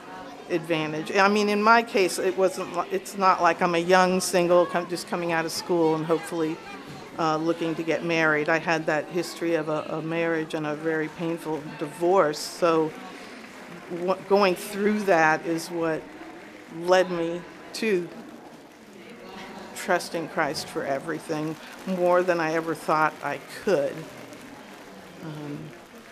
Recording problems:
murmuring crowd; noticeable; throughout; 15 dB below the speech

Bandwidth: 14.5 kHz